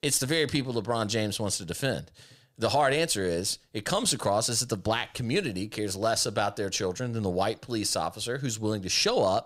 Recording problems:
none

